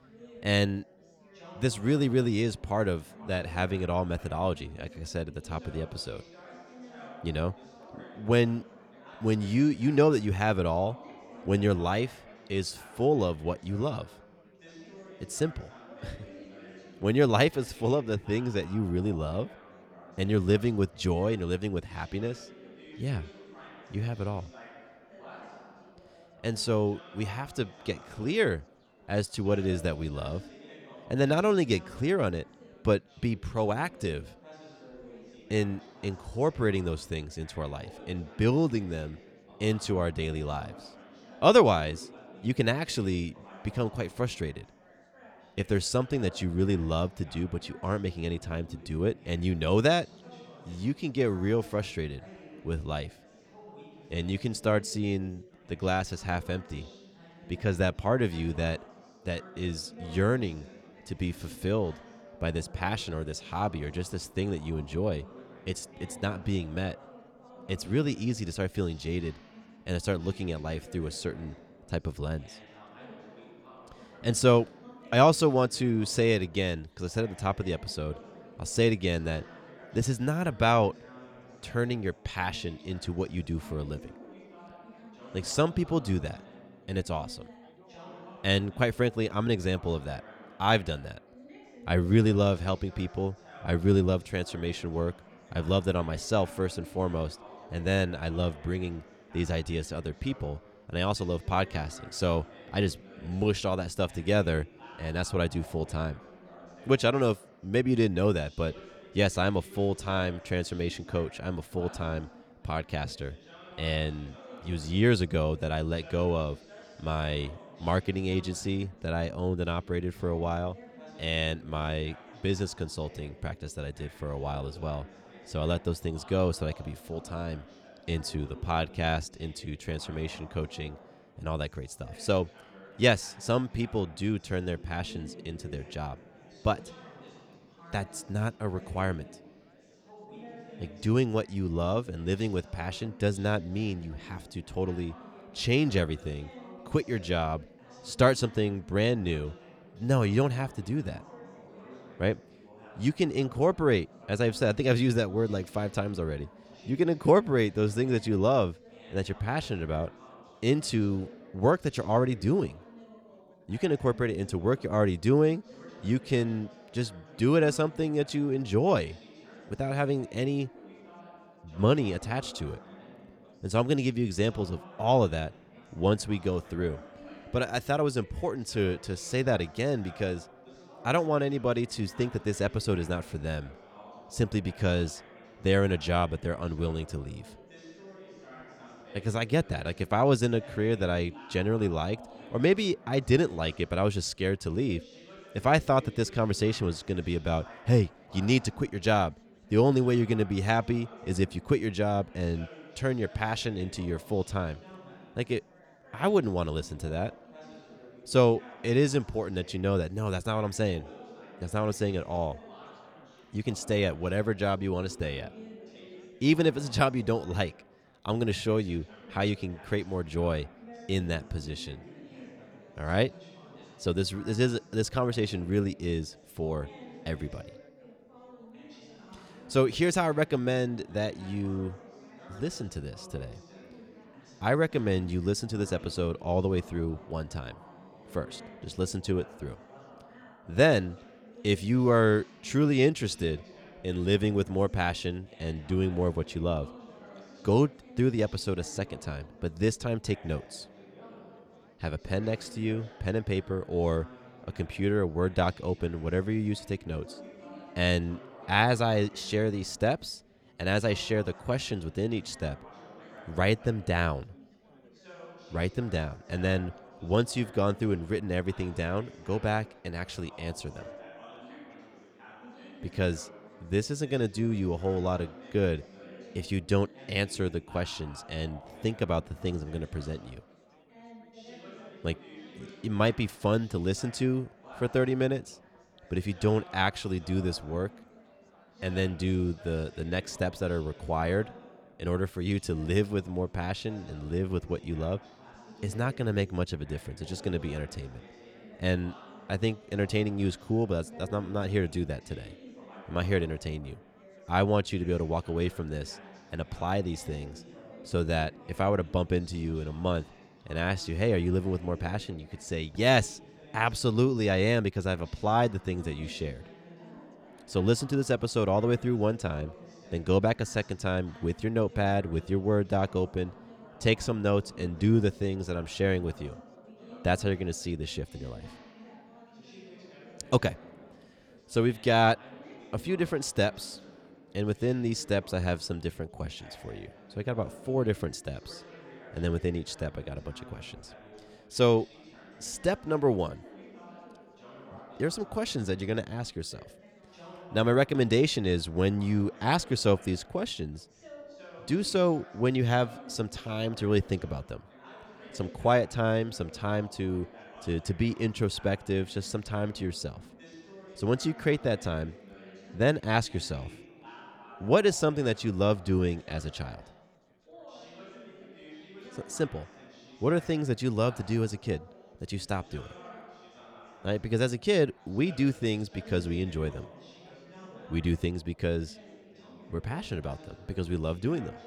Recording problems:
chatter from many people; faint; throughout; 20 dB below the speech

